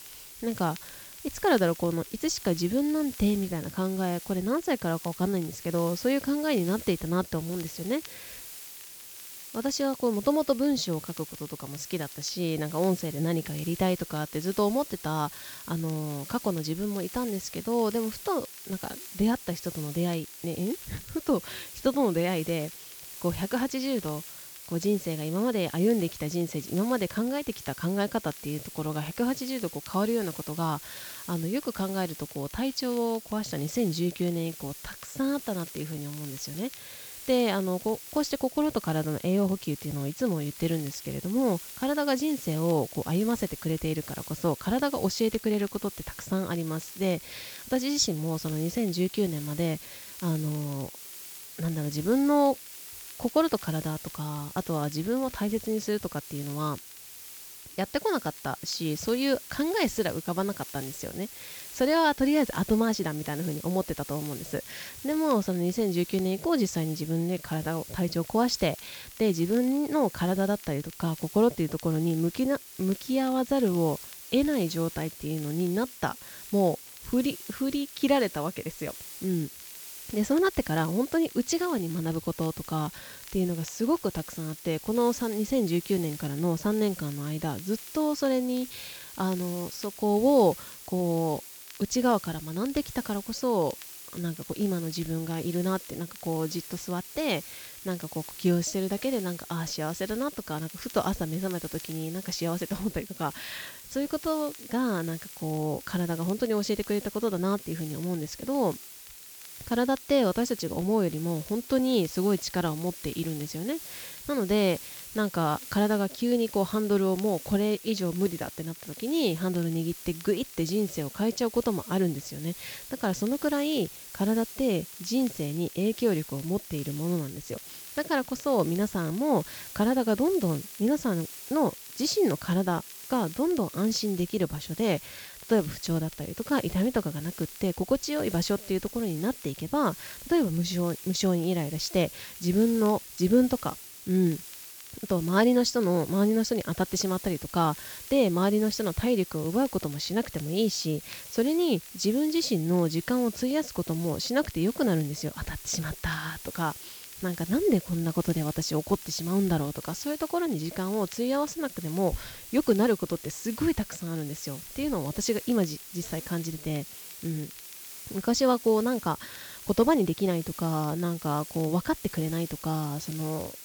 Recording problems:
high frequencies cut off; noticeable; nothing above 8 kHz
hiss; noticeable; throughout; 15 dB below the speech
crackle, like an old record; faint; 25 dB below the speech

